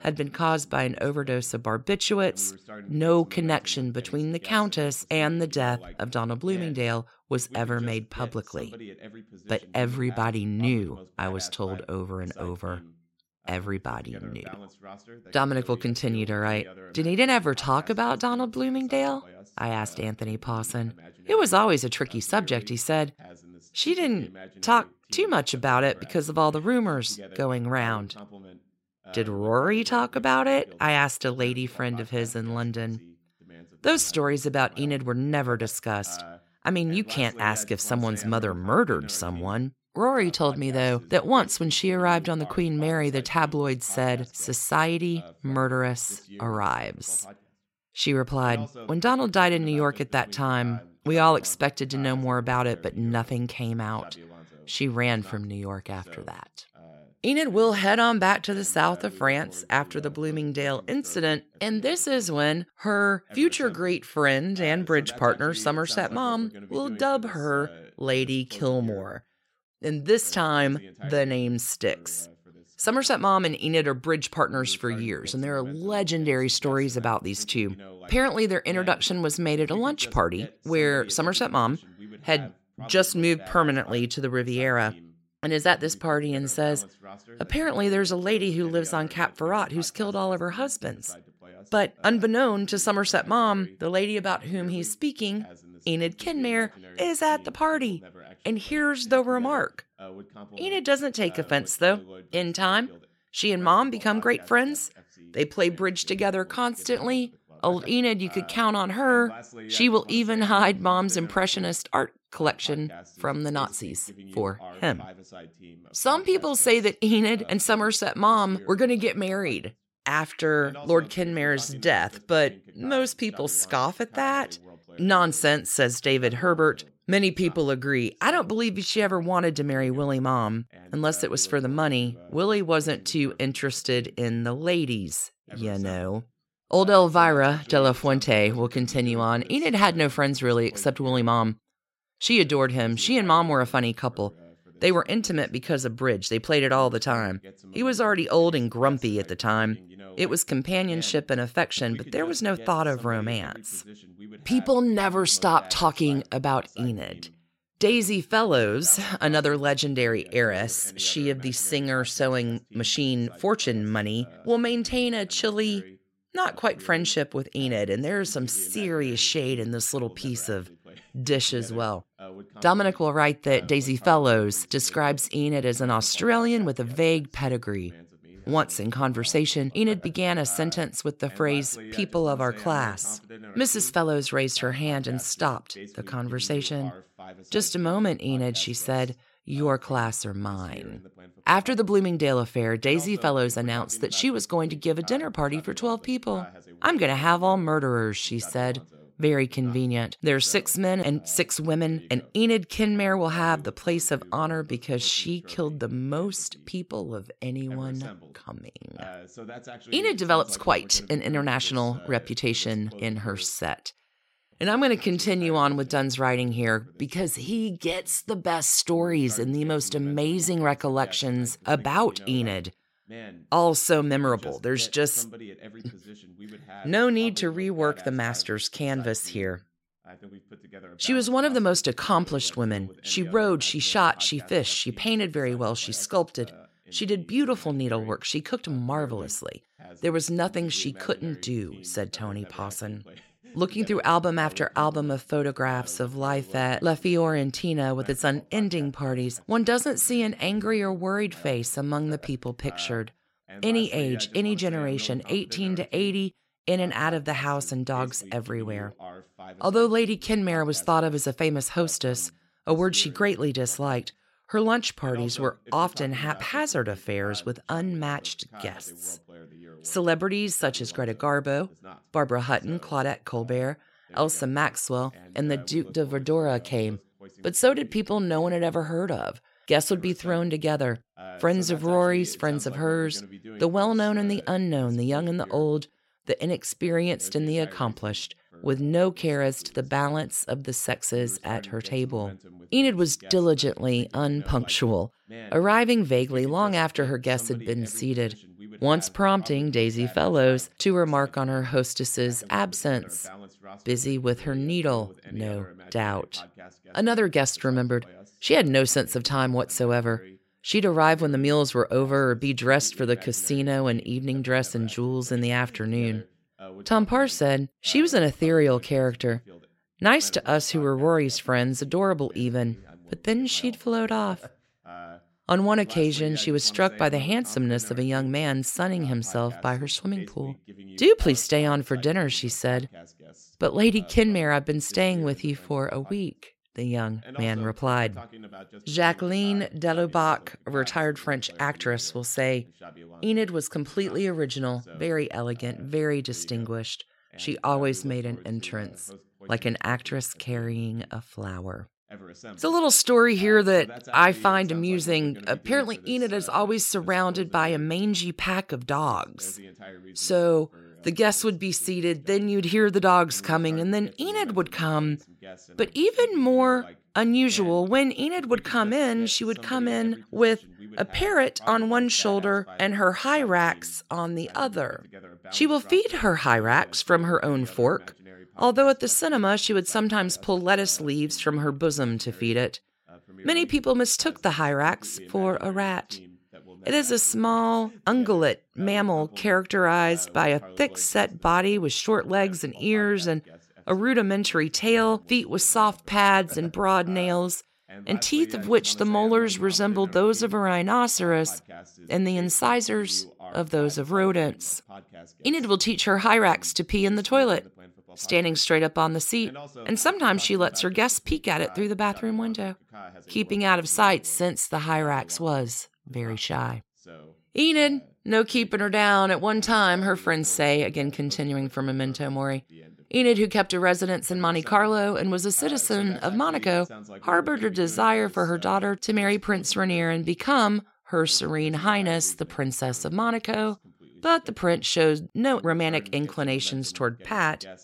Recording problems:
voice in the background; faint; throughout; 20 dB below the speech

